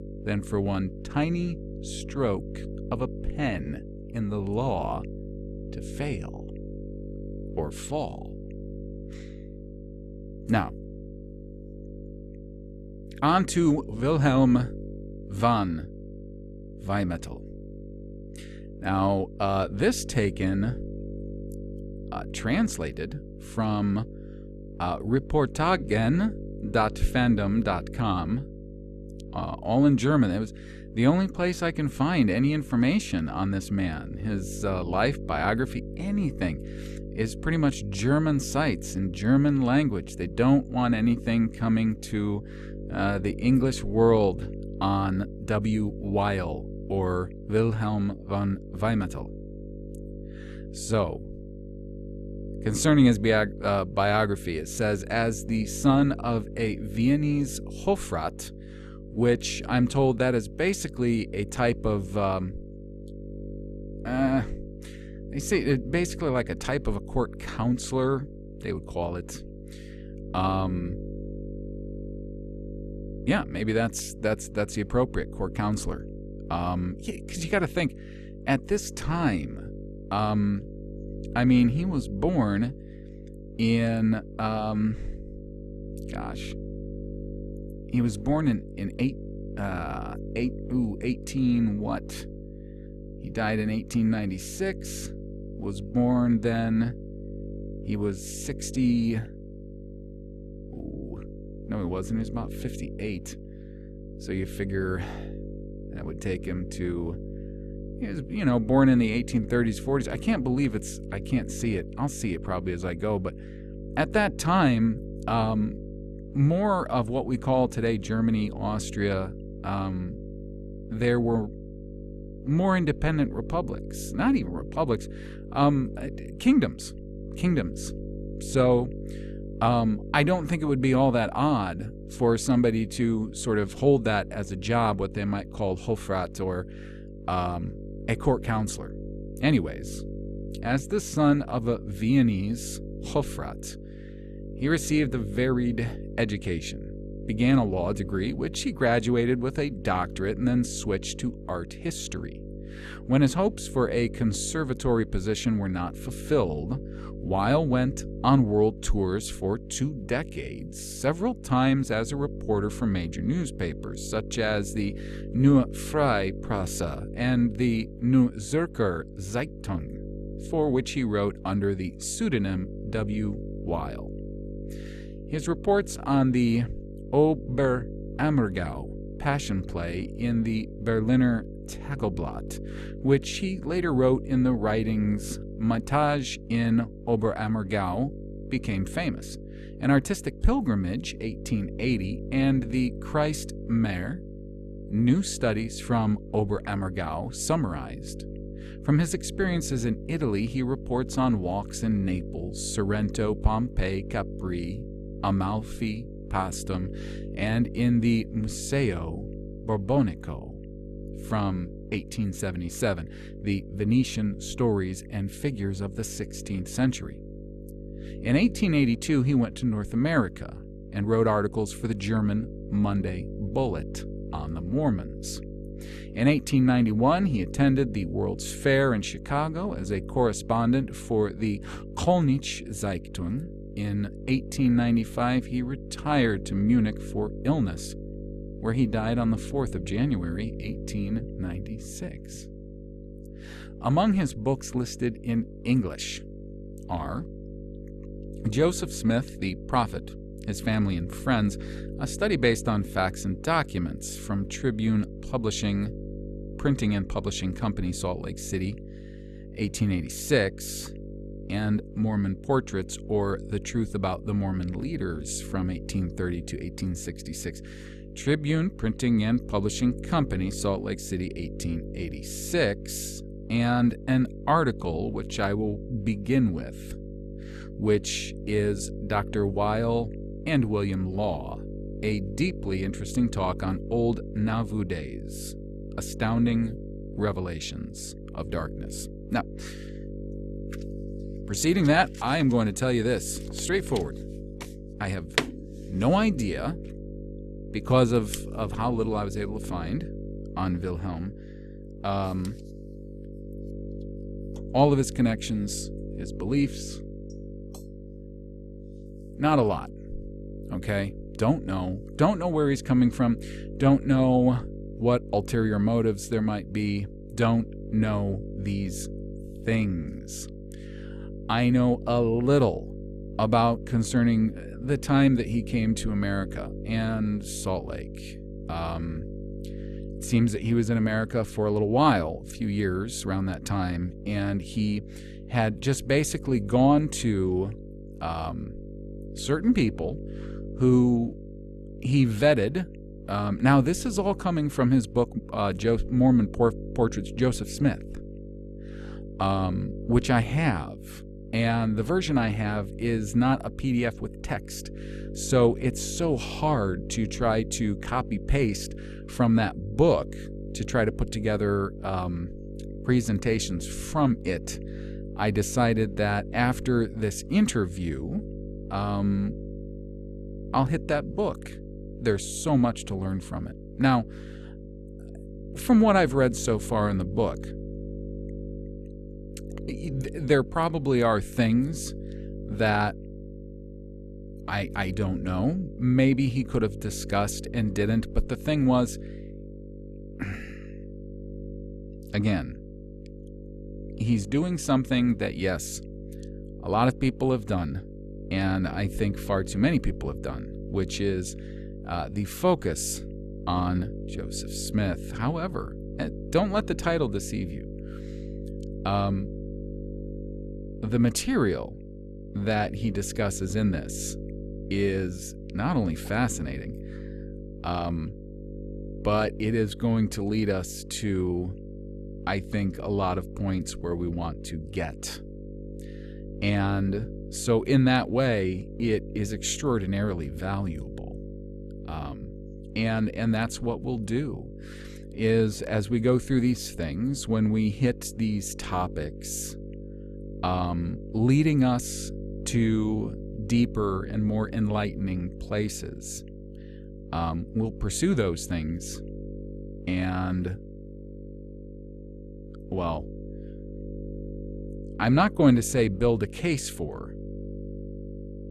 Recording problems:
electrical hum; noticeable; throughout; 50 Hz, 15 dB below the speech

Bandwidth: 13.5 kHz